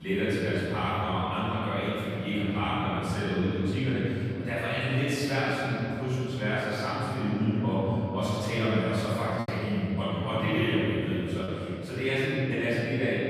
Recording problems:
room echo; strong; dies away in 3 s
off-mic speech; far
abrupt cut into speech; at the start
choppy; occasionally; from 9.5 to 11 s; 1% of the speech affected

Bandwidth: 14.5 kHz